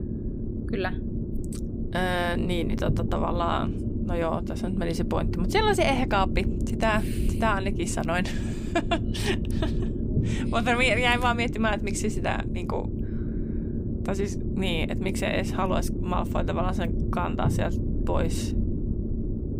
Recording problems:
low rumble; noticeable; throughout; 10 dB below the speech

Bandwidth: 15.5 kHz